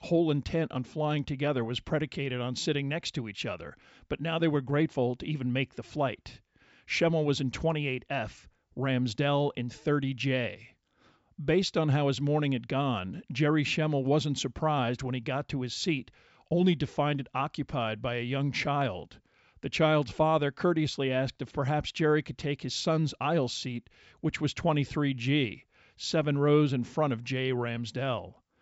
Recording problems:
high frequencies cut off; noticeable; nothing above 7.5 kHz

